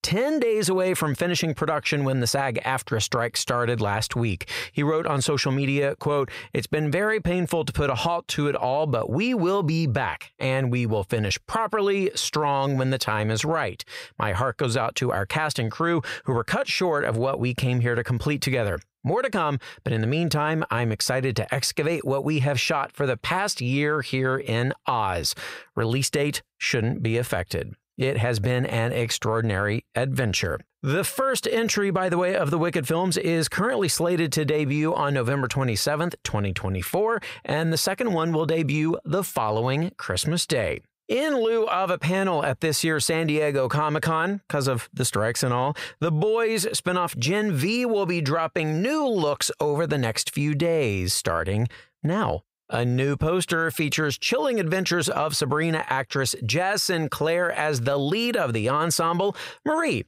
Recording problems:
squashed, flat; heavily

